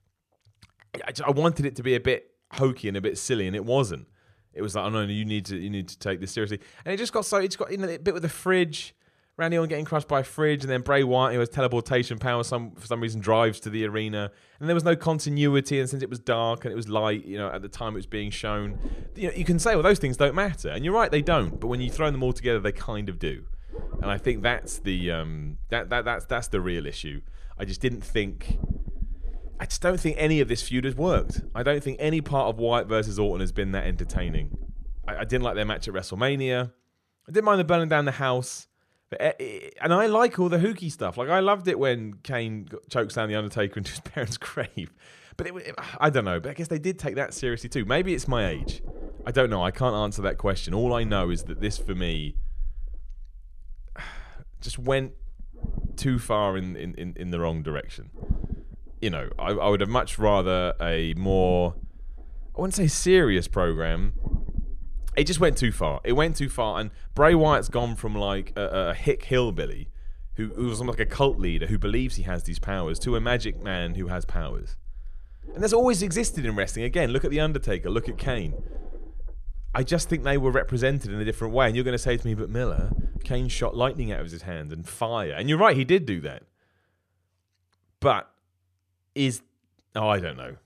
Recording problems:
low rumble; faint; from 17 to 36 s and from 47 s to 1:24; 25 dB below the speech

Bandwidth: 14 kHz